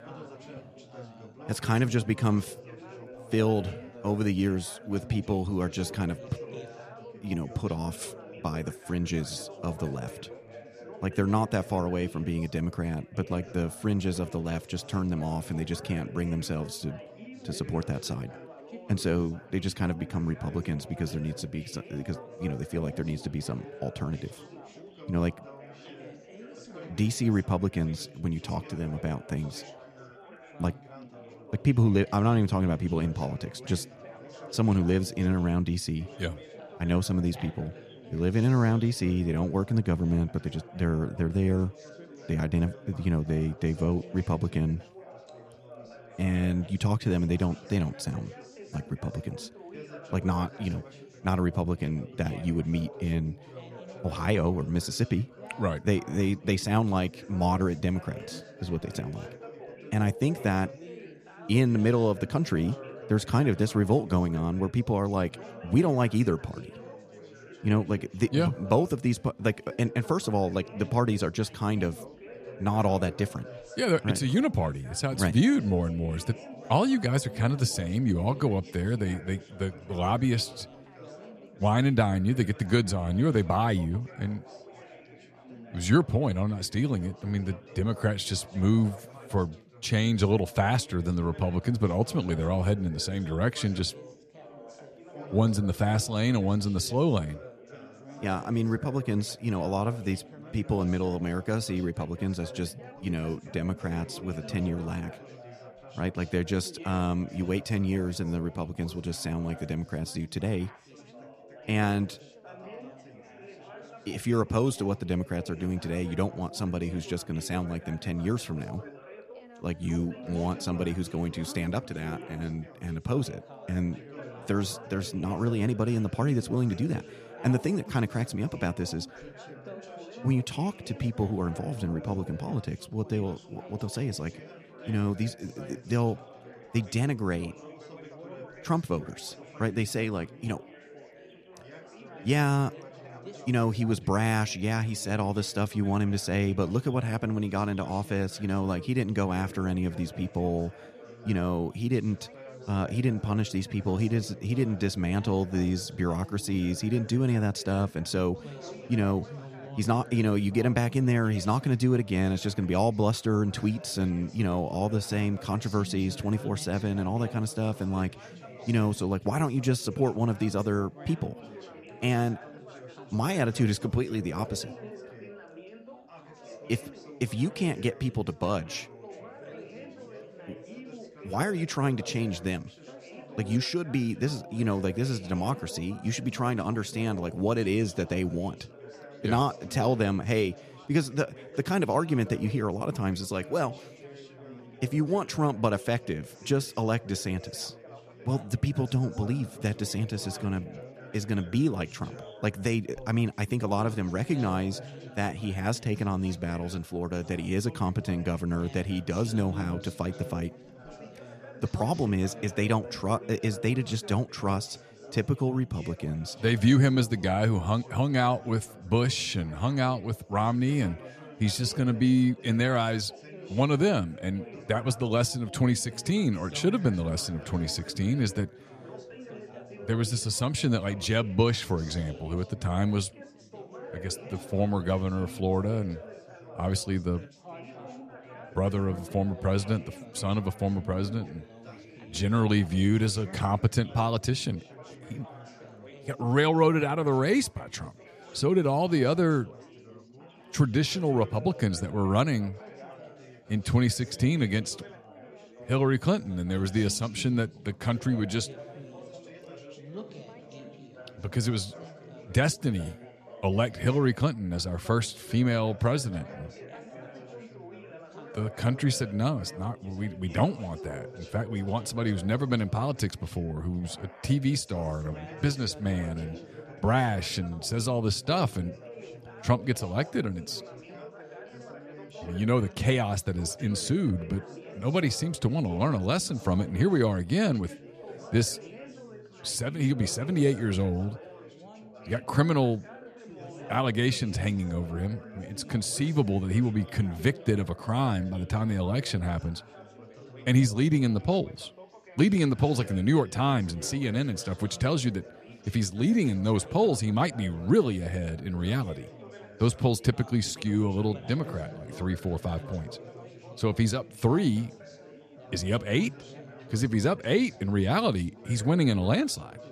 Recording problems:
chatter from many people; noticeable; throughout; 15 dB below the speech

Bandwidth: 14 kHz